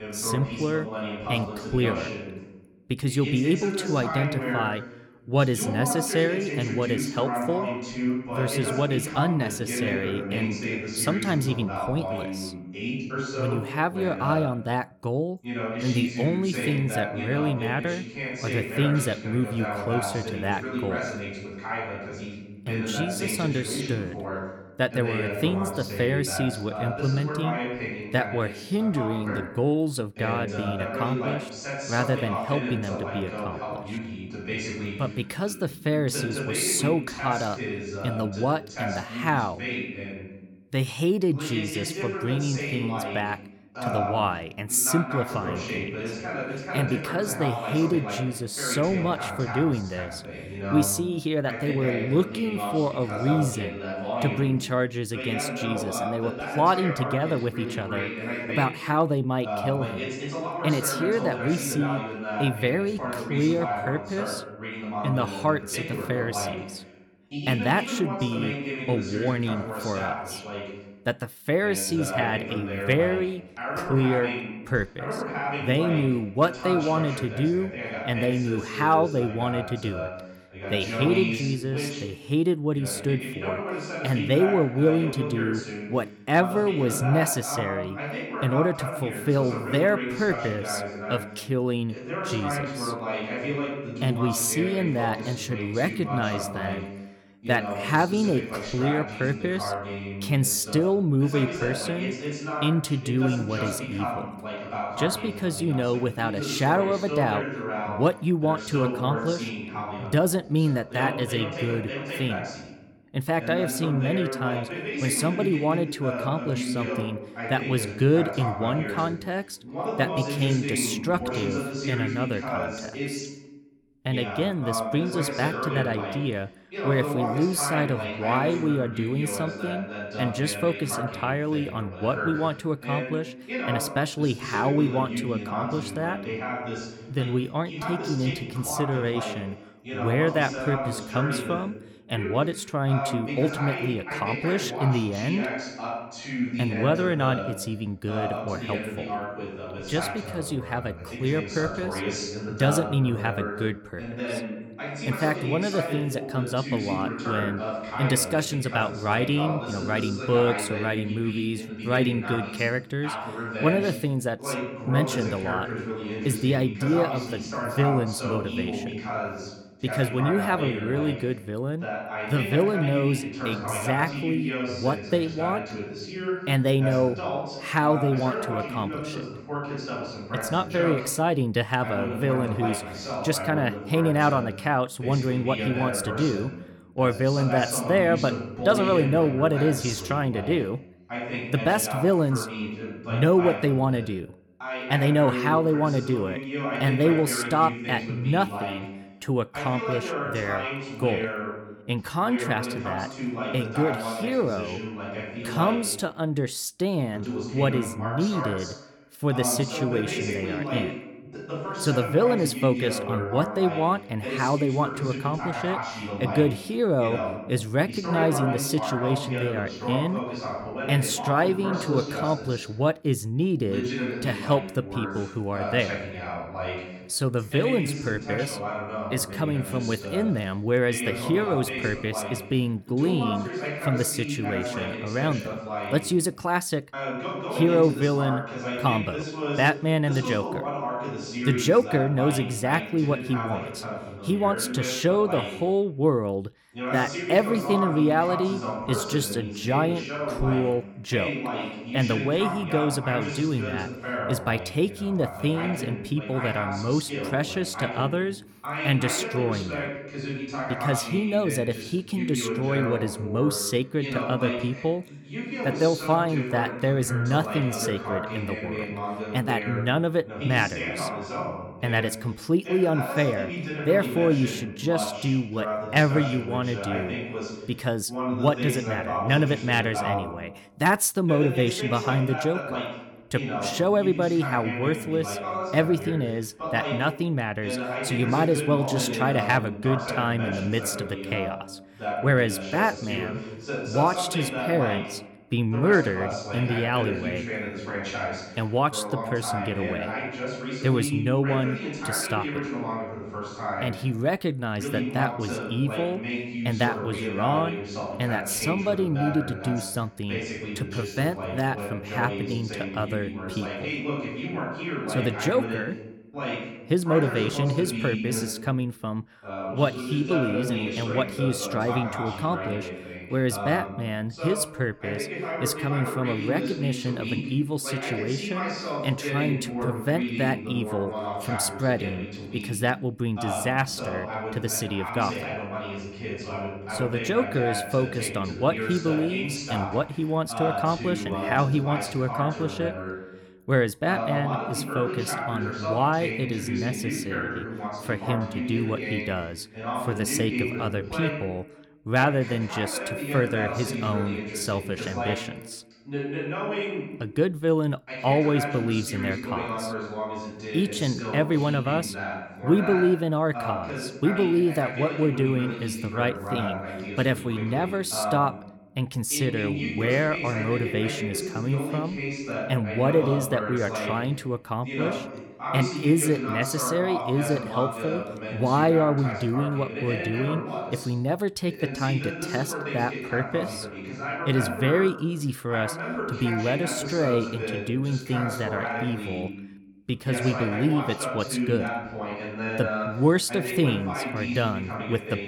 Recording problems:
voice in the background; loud; throughout; 5 dB below the speech

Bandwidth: 18 kHz